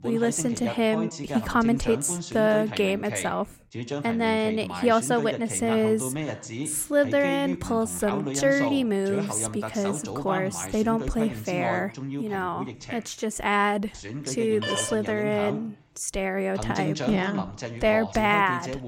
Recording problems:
voice in the background; loud; throughout; 8 dB below the speech
phone ringing; noticeable; at 15 s; peak 4 dB below the speech

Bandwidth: 16 kHz